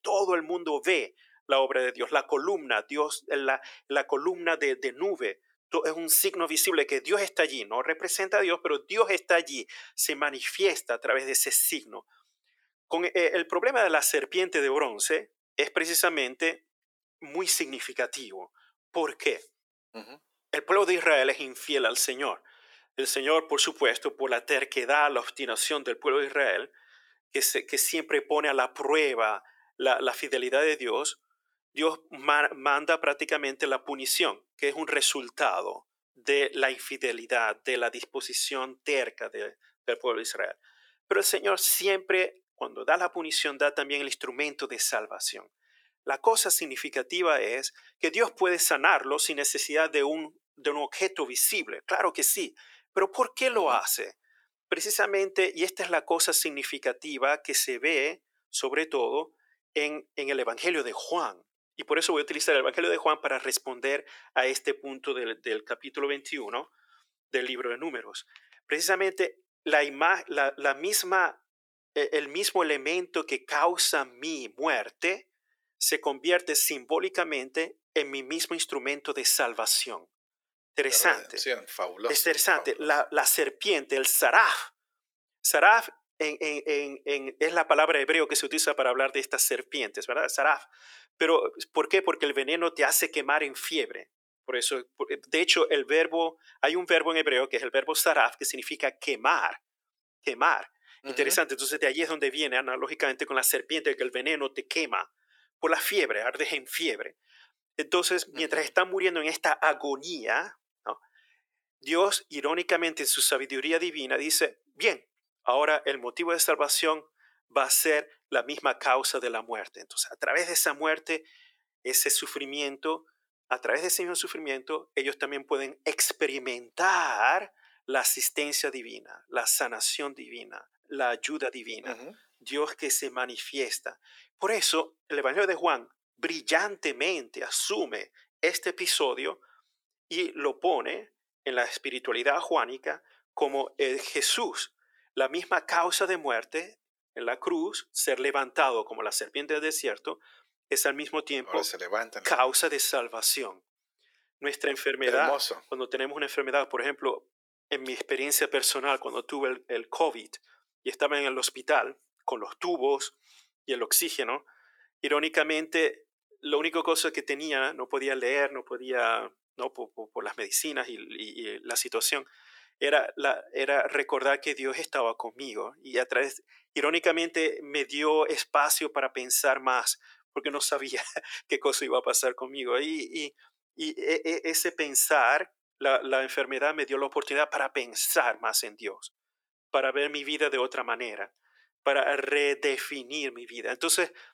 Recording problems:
thin; very; fading below 400 Hz

